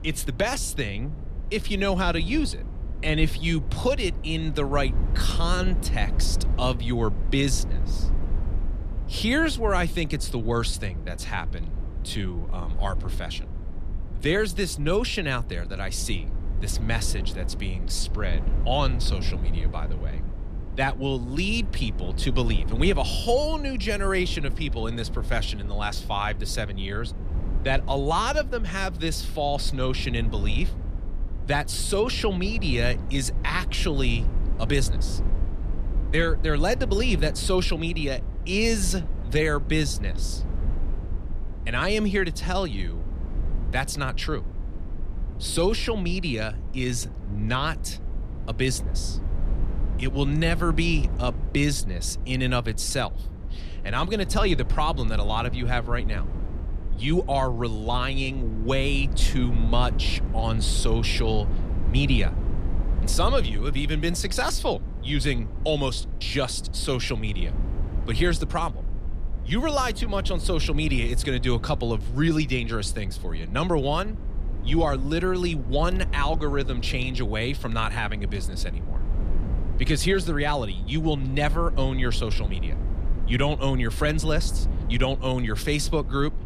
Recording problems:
low rumble; noticeable; throughout; 15 dB below the speech

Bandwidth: 14.5 kHz